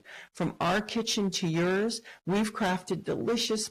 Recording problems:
distortion; heavy; 13% of the sound clipped
garbled, watery; slightly; nothing above 15 kHz

